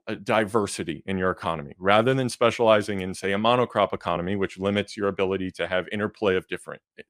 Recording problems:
none

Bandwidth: 15 kHz